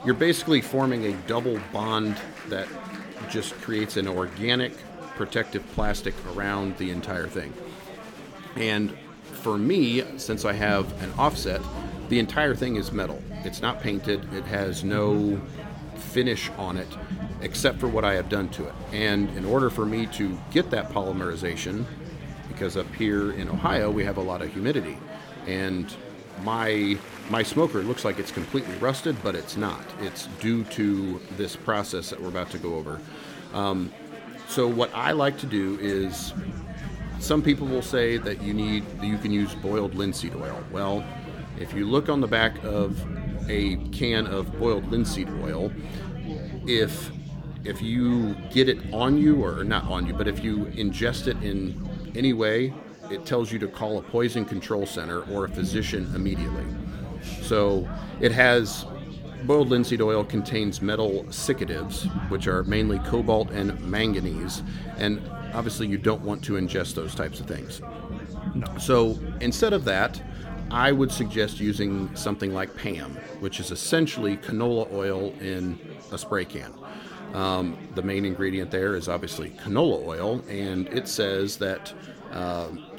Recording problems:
chatter from many people; noticeable; throughout; 15 dB below the speech
low rumble; noticeable; from 10 to 24 s, from 36 to 52 s and from 55 s to 1:12; 20 dB below the speech

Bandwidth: 17 kHz